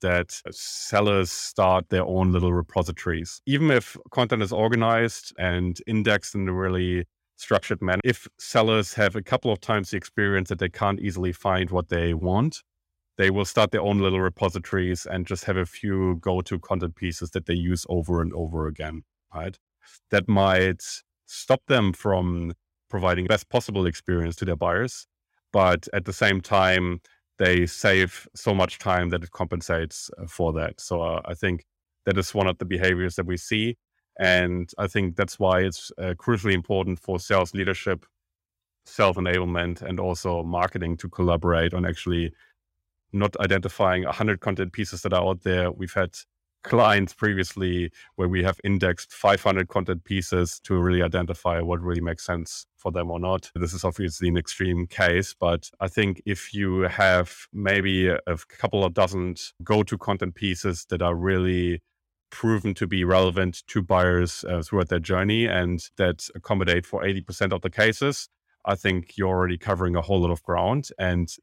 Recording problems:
none

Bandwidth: 16 kHz